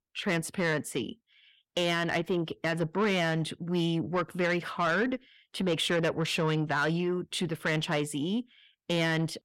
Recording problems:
distortion; slight; 10 dB below the speech

